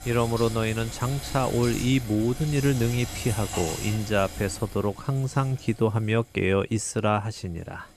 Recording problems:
household noises; noticeable; throughout; 10 dB below the speech

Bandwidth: 14.5 kHz